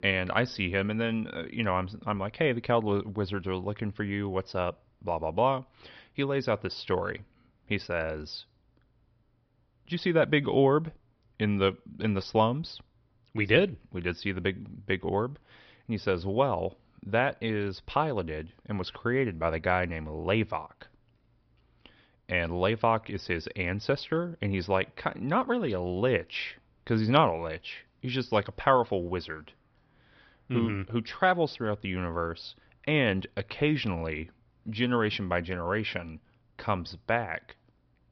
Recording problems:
high frequencies cut off; noticeable; nothing above 5.5 kHz

